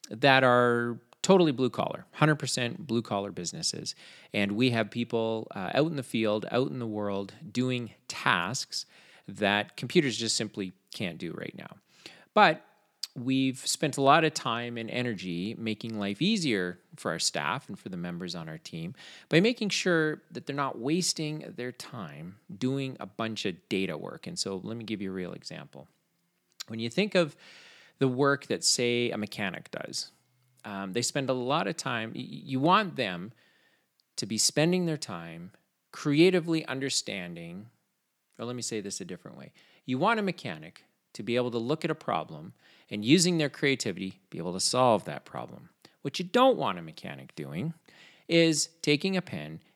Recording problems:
none

